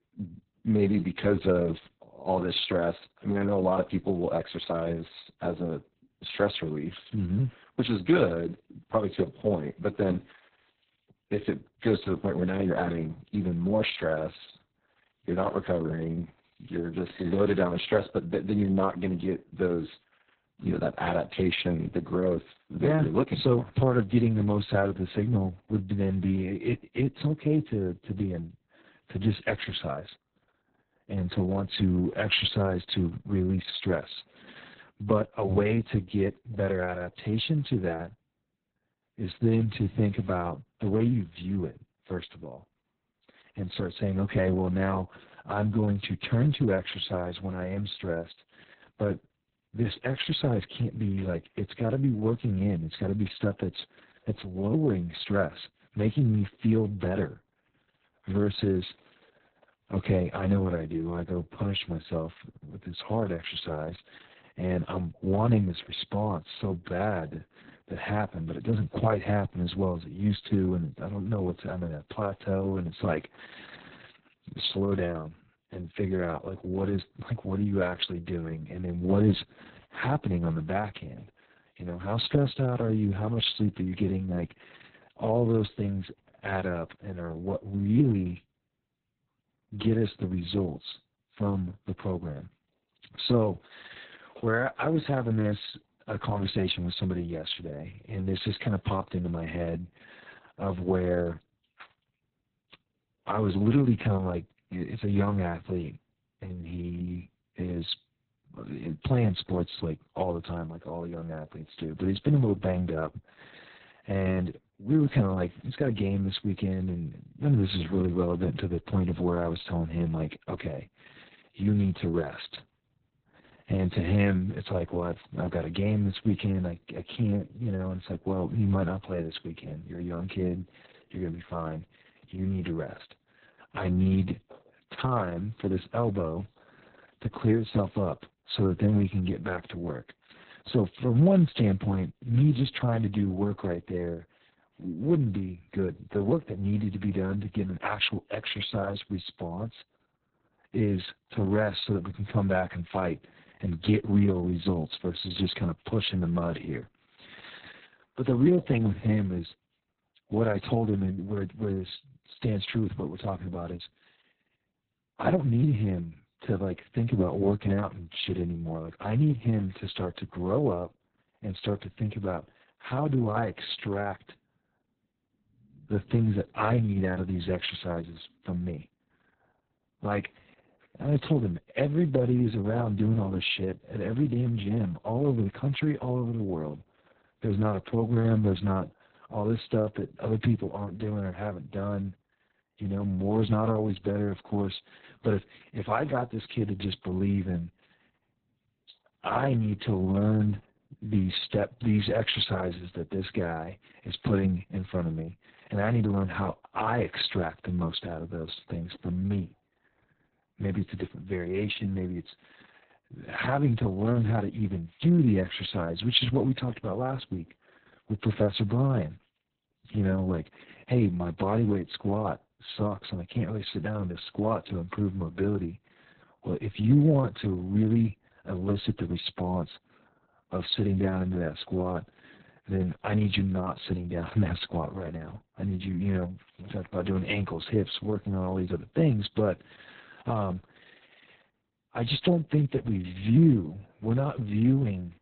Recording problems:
garbled, watery; badly; nothing above 4 kHz

